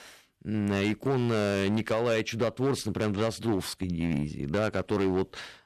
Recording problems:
distortion; slight; 9% of the sound clipped

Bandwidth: 13.5 kHz